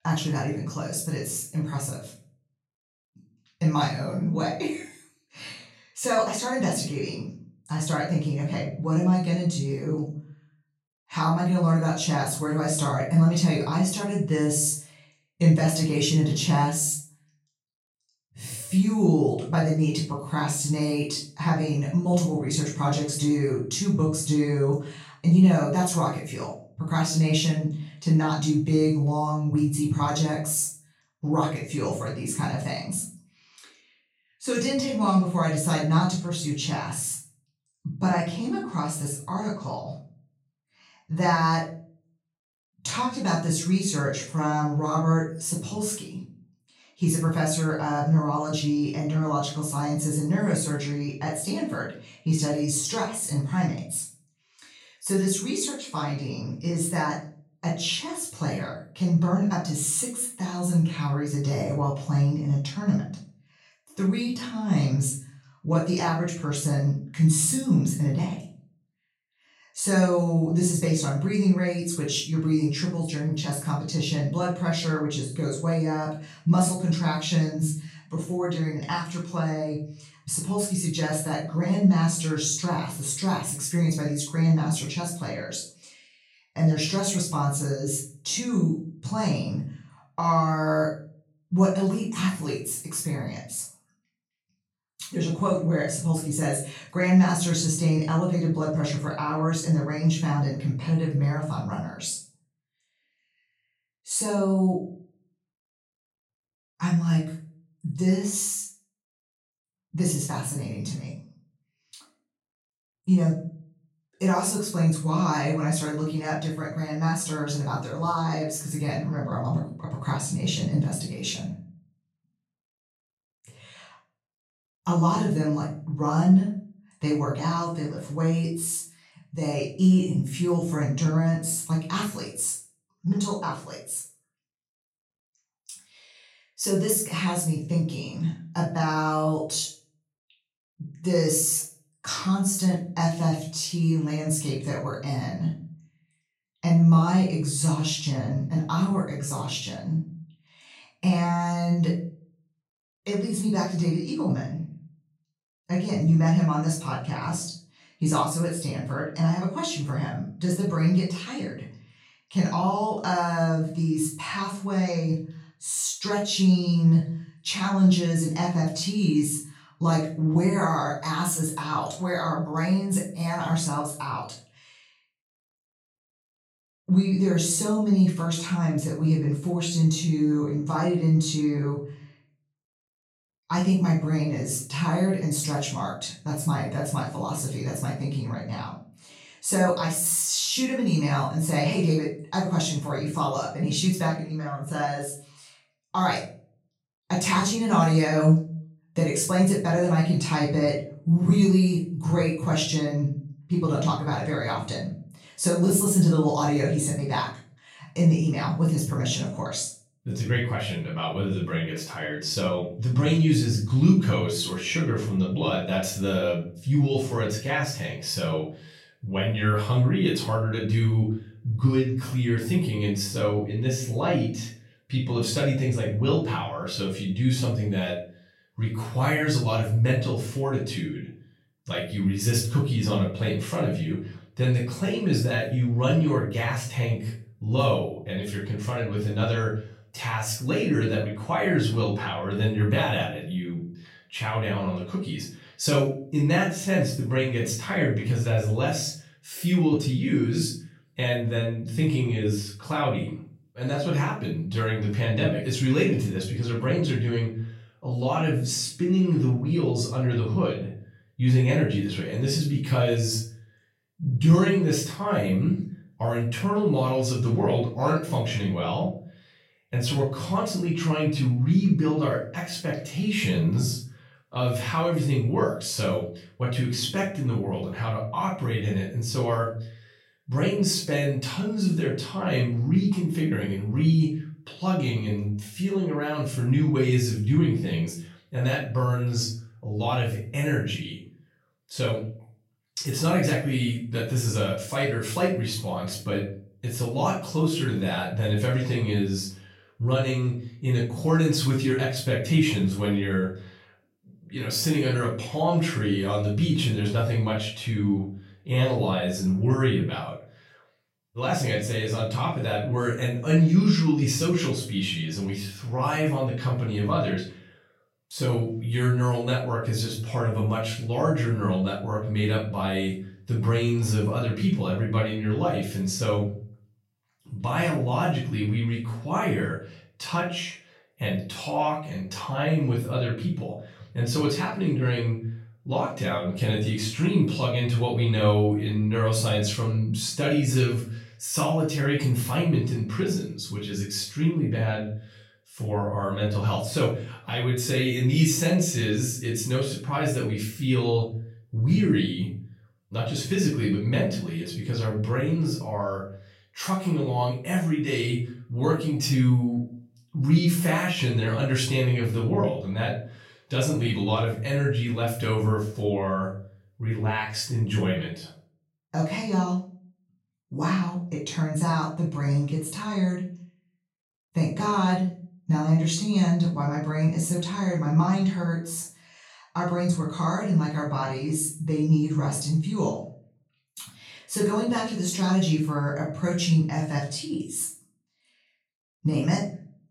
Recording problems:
off-mic speech; far
room echo; noticeable; dies away in 0.4 s

